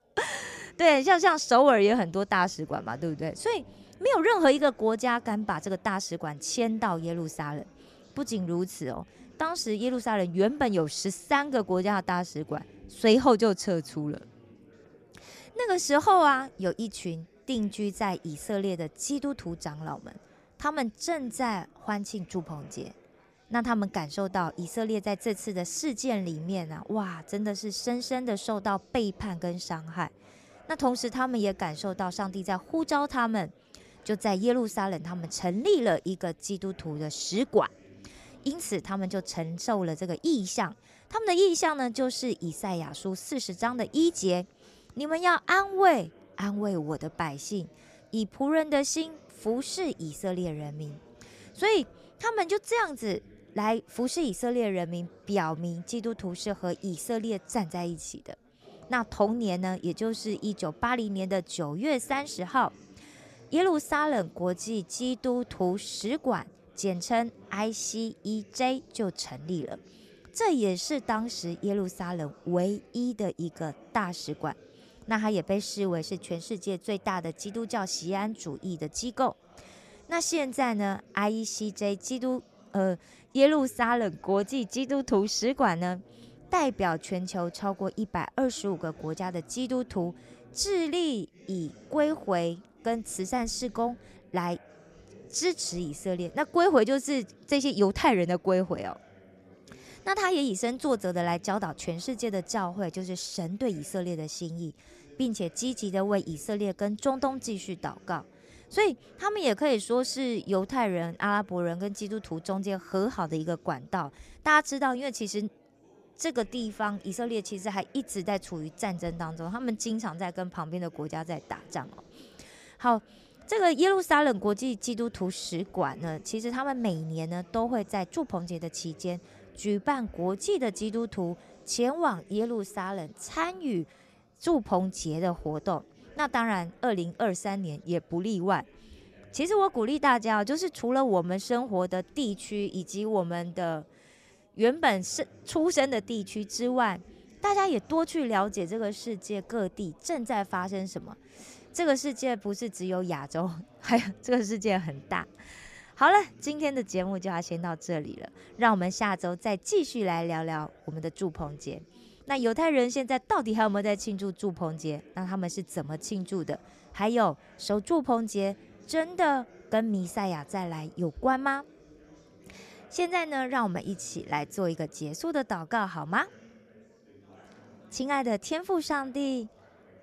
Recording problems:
chatter from many people; faint; throughout; 25 dB below the speech

